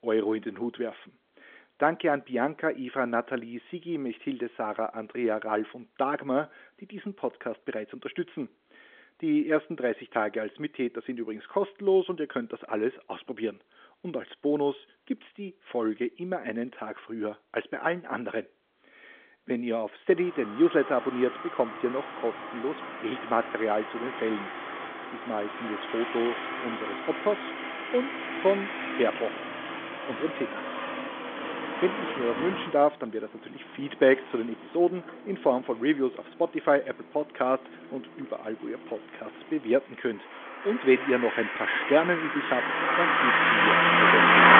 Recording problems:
phone-call audio; nothing above 3.5 kHz
traffic noise; very loud; from 20 s on; 1 dB above the speech

